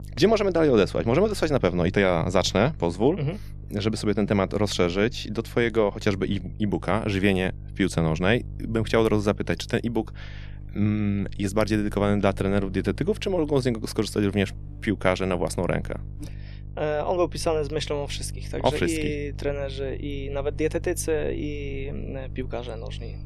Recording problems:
electrical hum; faint; throughout; 50 Hz, 25 dB below the speech

